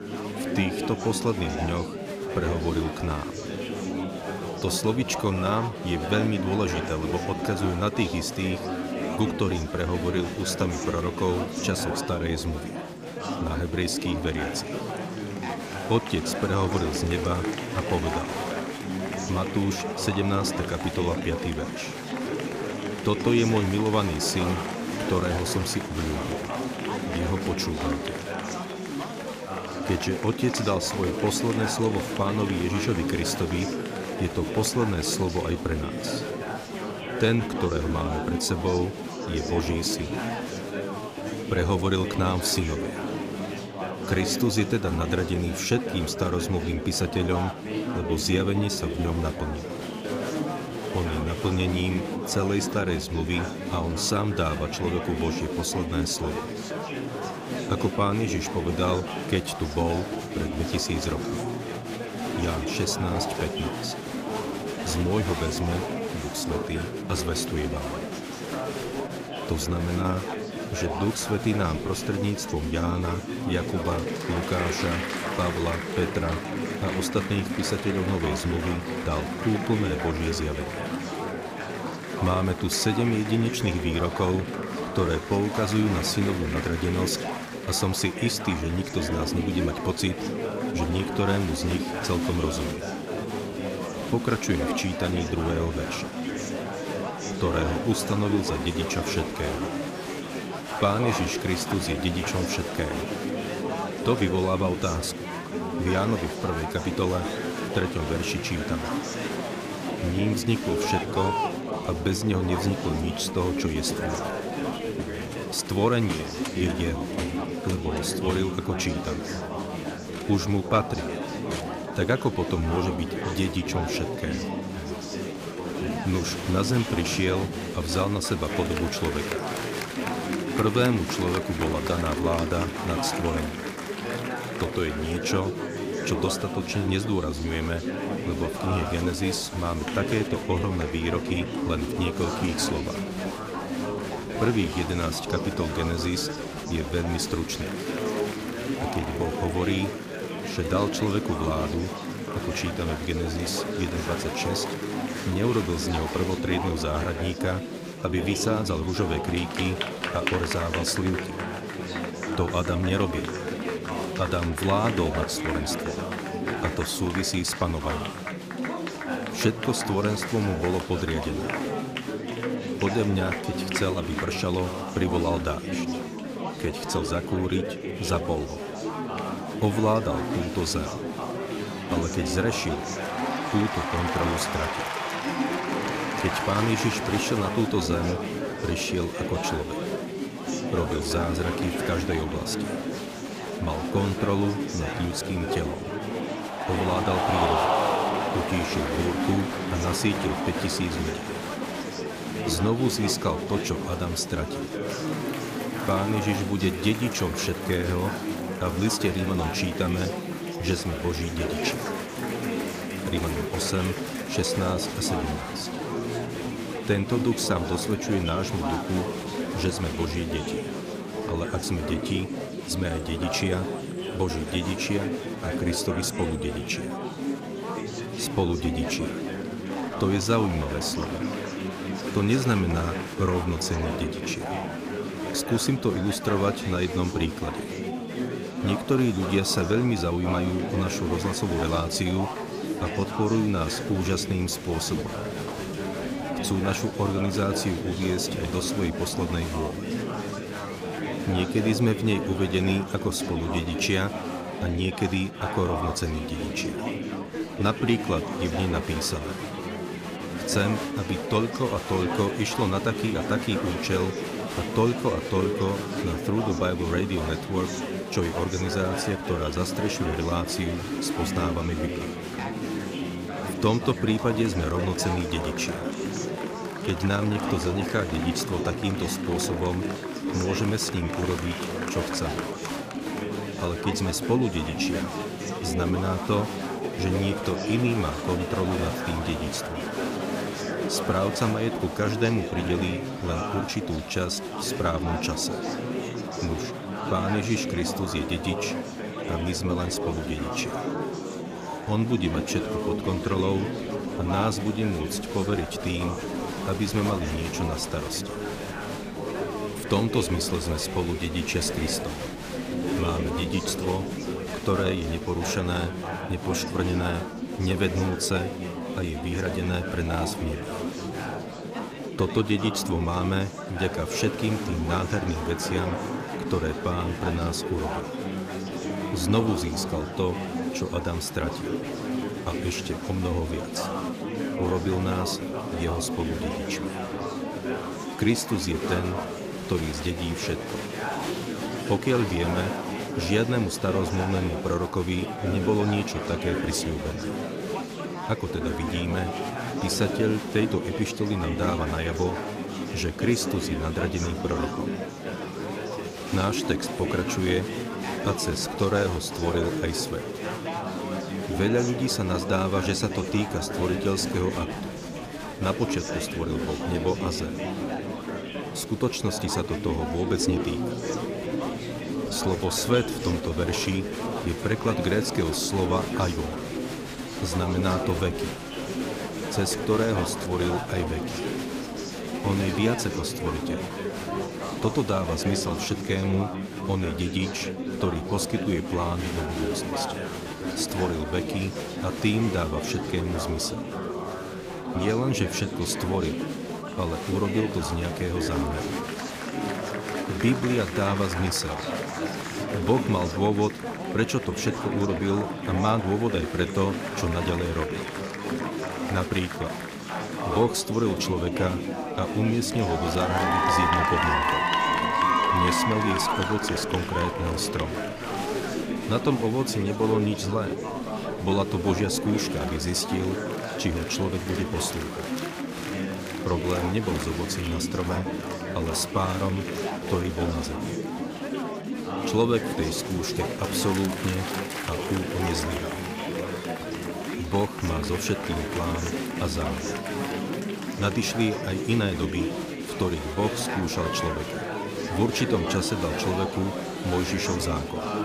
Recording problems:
chatter from many people; loud; throughout; 3 dB below the speech

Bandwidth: 15 kHz